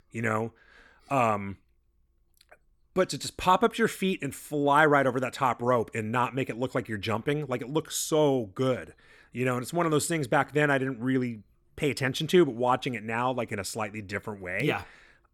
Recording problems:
none

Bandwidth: 17.5 kHz